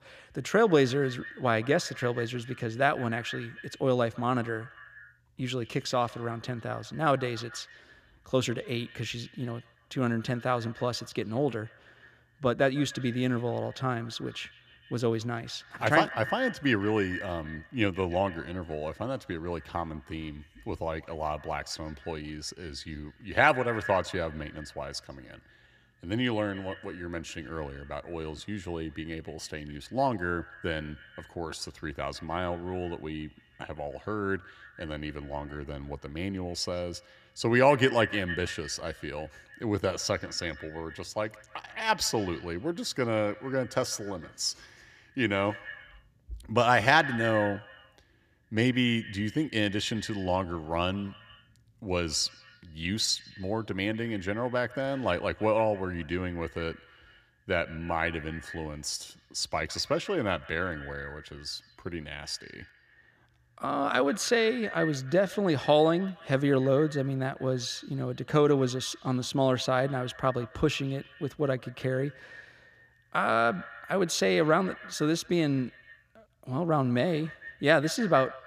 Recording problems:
echo of what is said; noticeable; throughout; 150 ms later, 15 dB below the speech

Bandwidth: 14.5 kHz